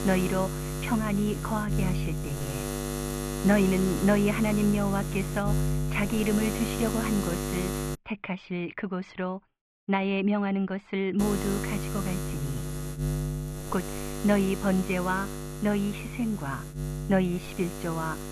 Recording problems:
muffled; very; fading above 2.5 kHz
electrical hum; loud; until 8 s and from 11 s on; 60 Hz, 6 dB below the speech

